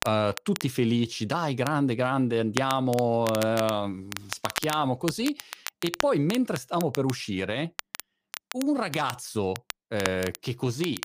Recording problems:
crackle, like an old record; loud; 10 dB below the speech

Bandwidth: 15 kHz